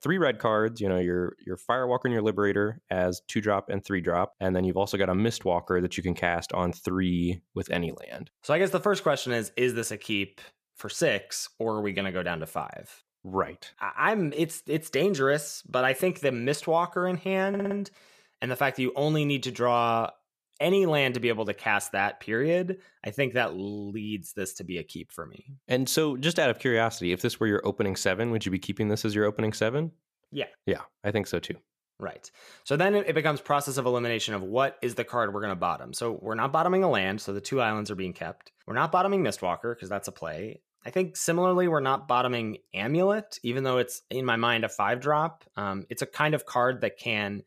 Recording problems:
audio stuttering; at 17 s

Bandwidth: 14.5 kHz